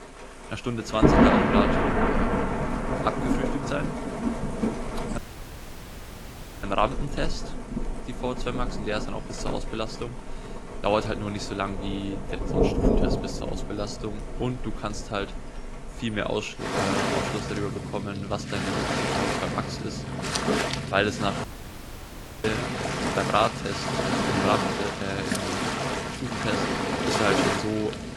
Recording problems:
garbled, watery; slightly; nothing above 12 kHz
rain or running water; very loud; throughout; 3 dB above the speech
audio cutting out; at 5 s for 1.5 s and at 21 s for 1 s

